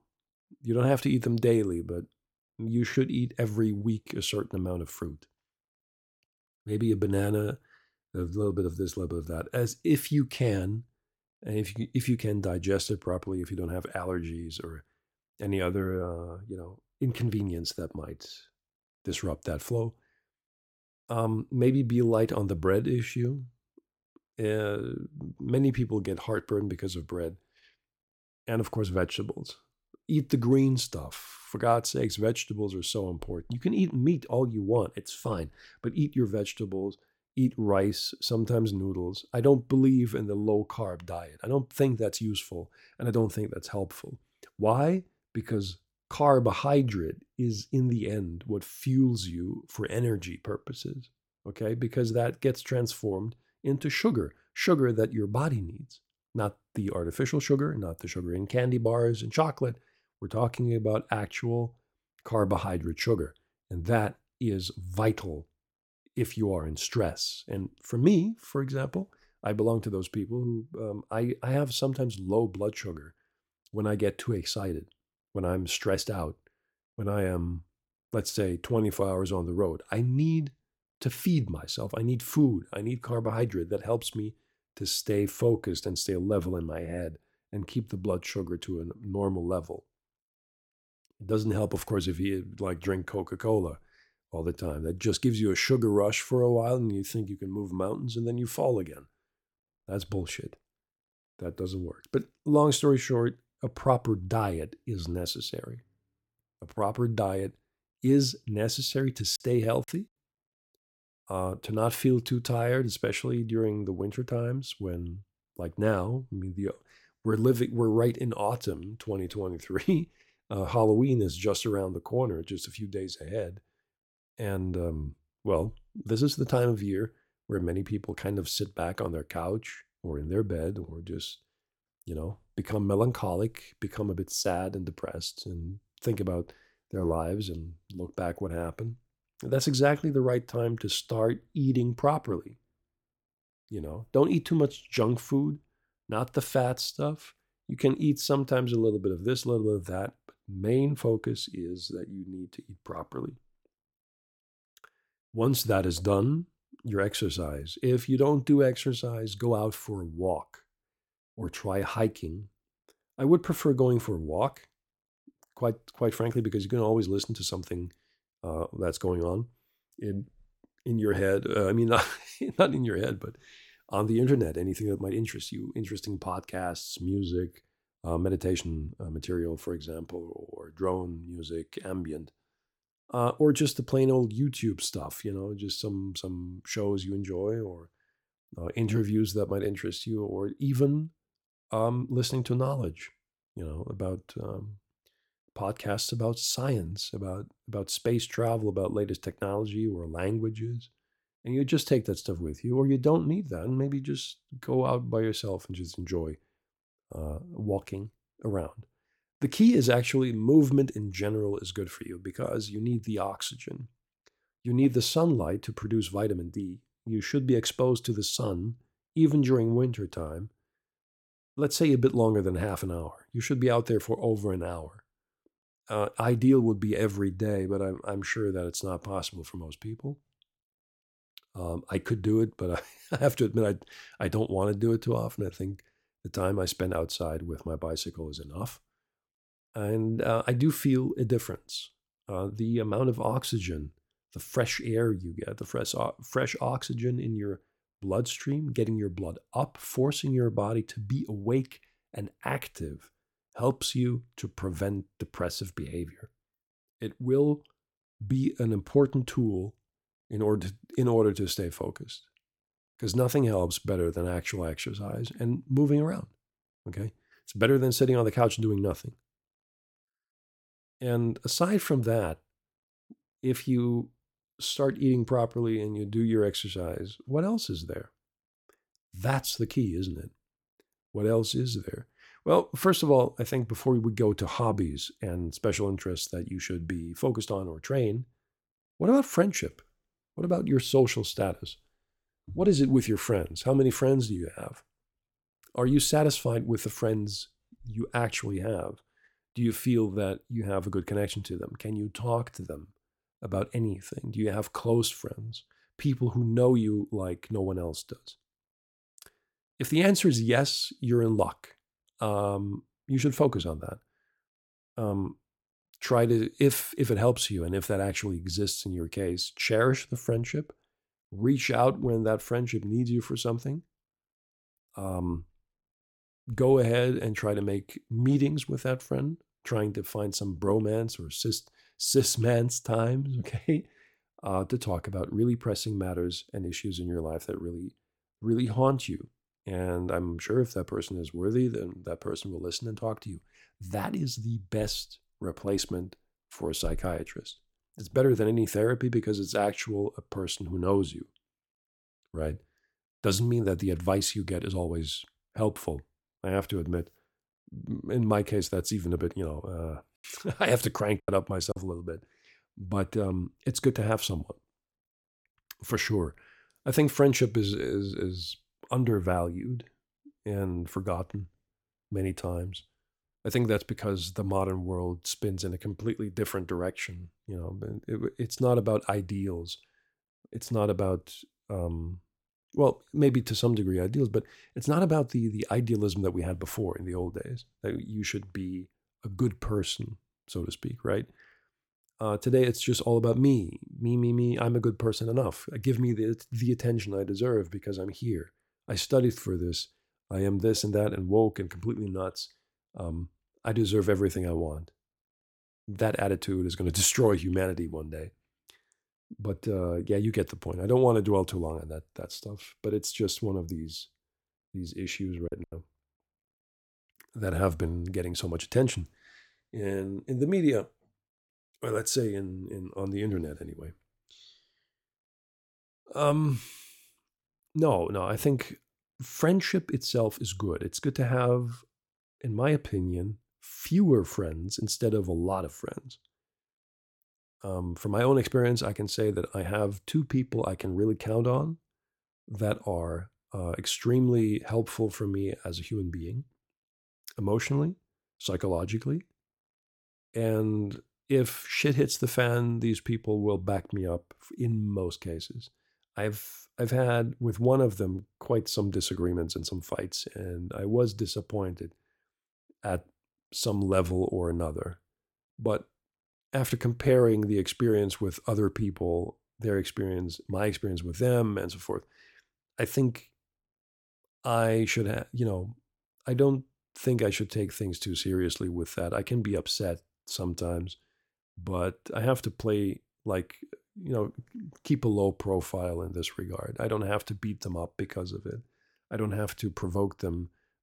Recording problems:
choppy; very; at 1:49, at 6:01 and at 6:55; 6% of the speech affected

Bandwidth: 17 kHz